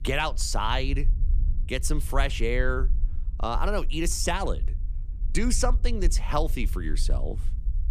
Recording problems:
low rumble; faint; throughout; 20 dB below the speech

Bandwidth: 14.5 kHz